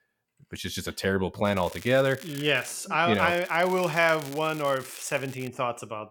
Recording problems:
crackling; noticeable; from 1.5 to 2.5 s and from 3 to 5.5 s; 20 dB below the speech

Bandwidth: 17.5 kHz